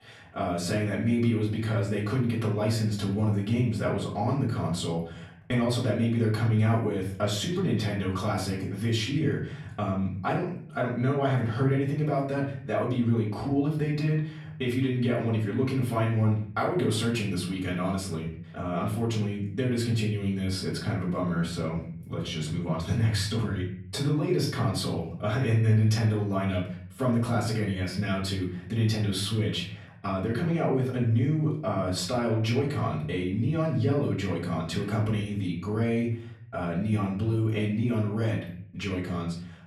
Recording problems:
off-mic speech; far
room echo; slight; dies away in 0.6 s

